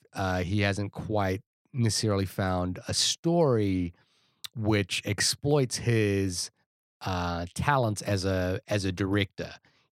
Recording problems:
none

